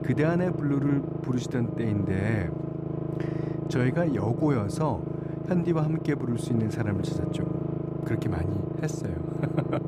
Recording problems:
low rumble; loud; throughout; 4 dB below the speech

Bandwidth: 14.5 kHz